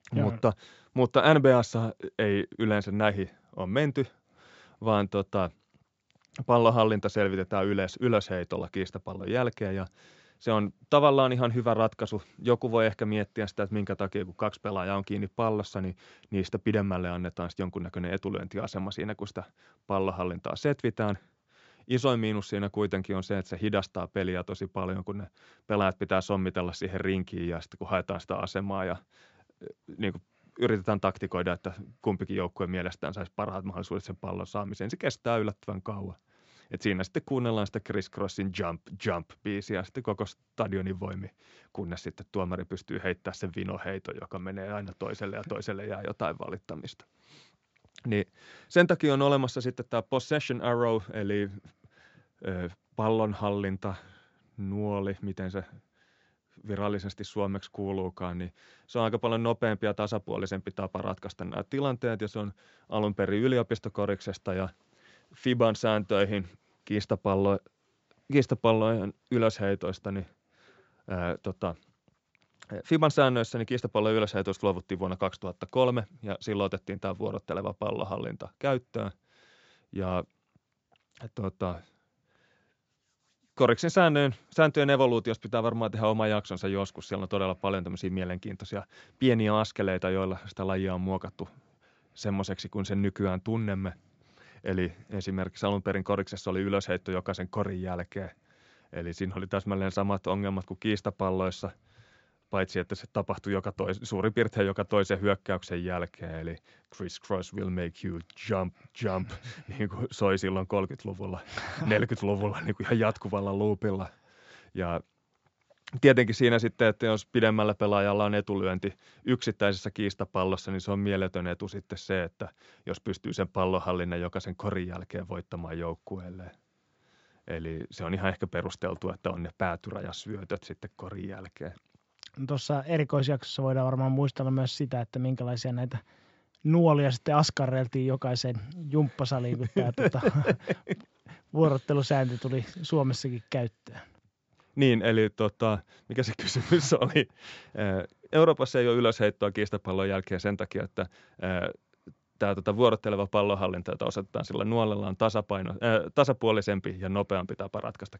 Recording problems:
high frequencies cut off; noticeable; nothing above 7.5 kHz

